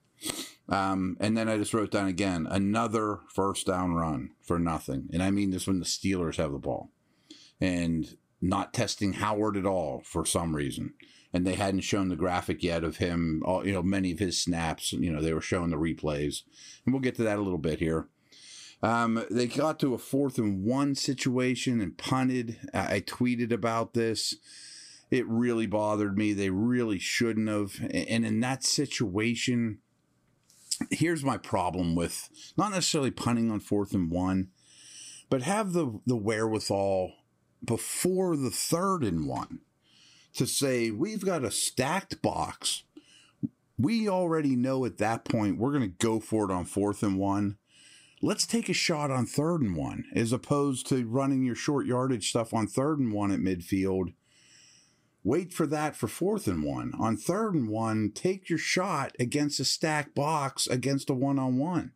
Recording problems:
squashed, flat; somewhat

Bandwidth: 15.5 kHz